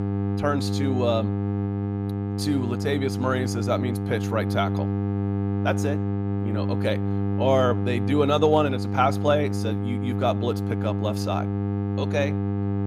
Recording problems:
electrical hum; loud; throughout; 50 Hz, 8 dB below the speech

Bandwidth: 15 kHz